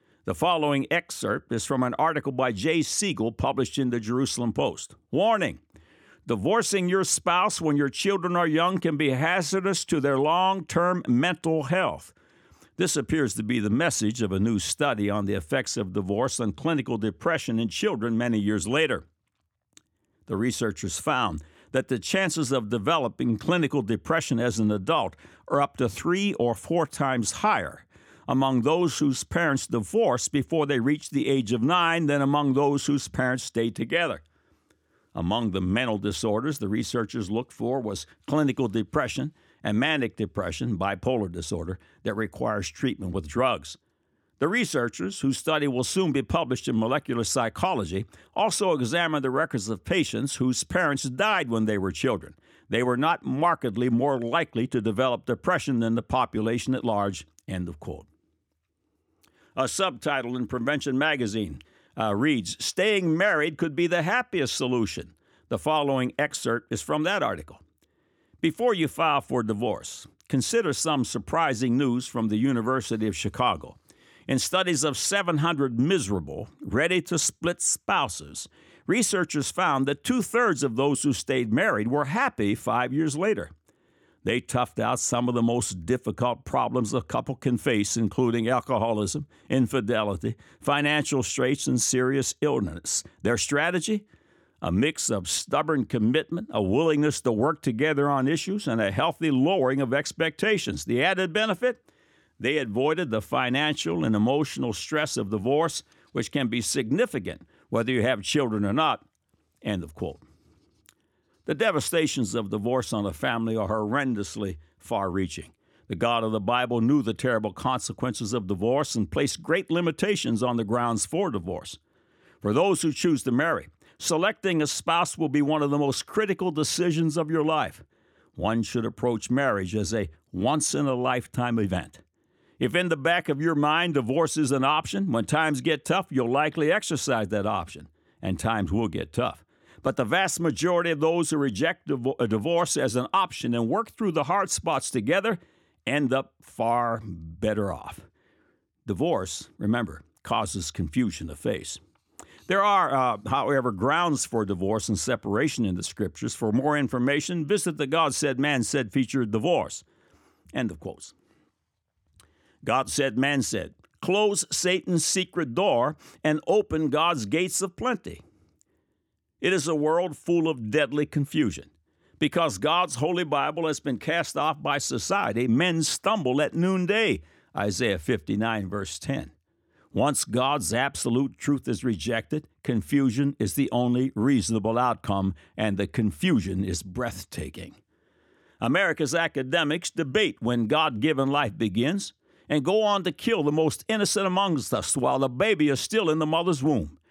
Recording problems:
none

